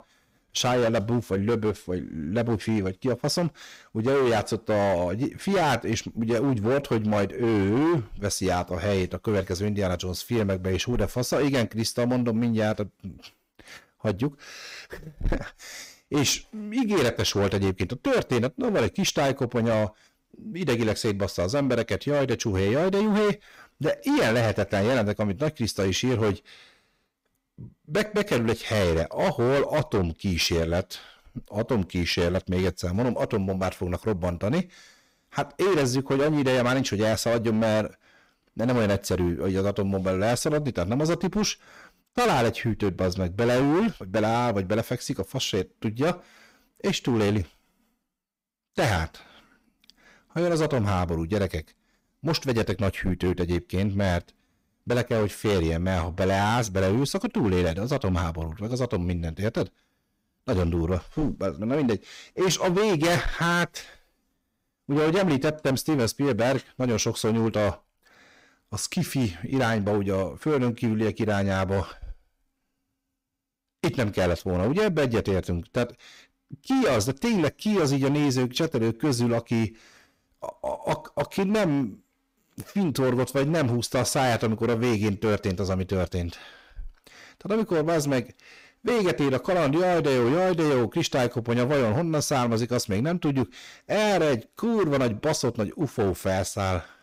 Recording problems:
distortion; heavy; 15% of the sound clipped

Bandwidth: 15.5 kHz